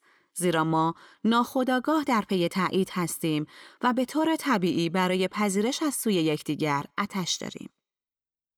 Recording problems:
none

